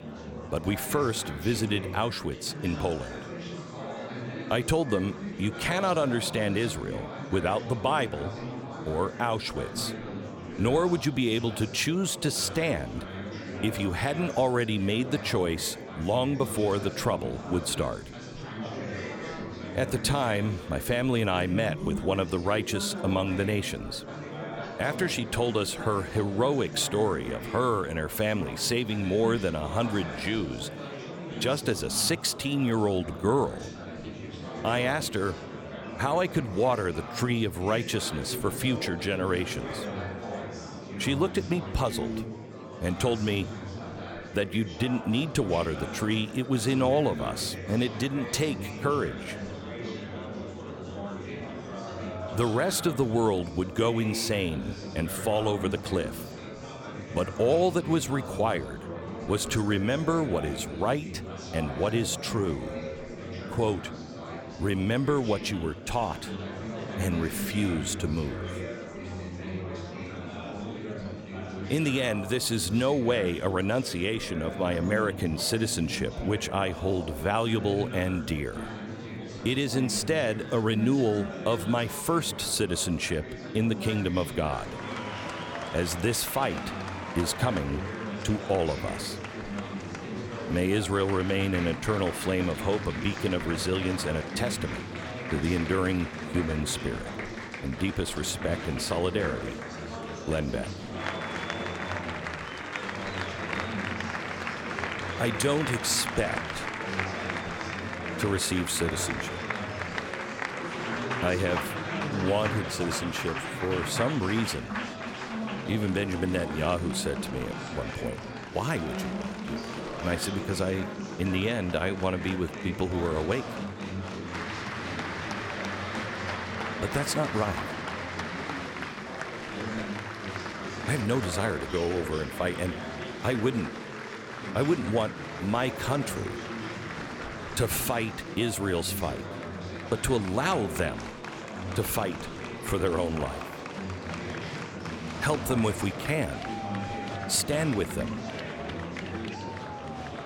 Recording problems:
murmuring crowd; loud; throughout; 7 dB below the speech

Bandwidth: 17.5 kHz